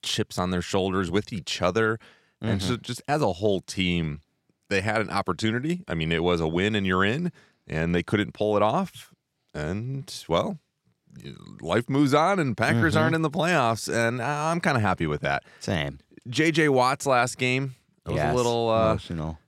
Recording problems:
none

